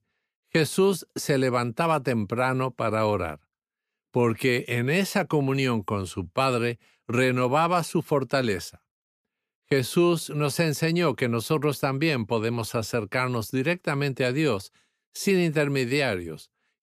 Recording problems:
none

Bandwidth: 14.5 kHz